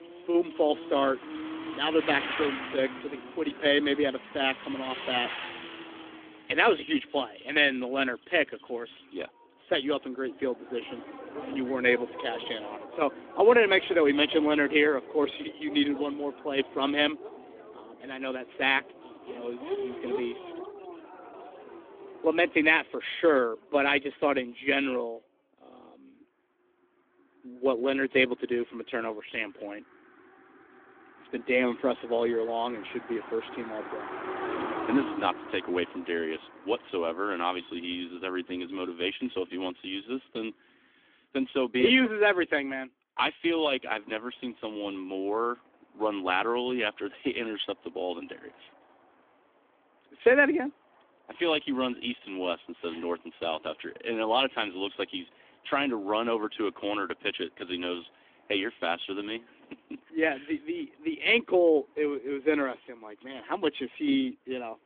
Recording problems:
phone-call audio; nothing above 3.5 kHz
traffic noise; noticeable; throughout; 10 dB below the speech

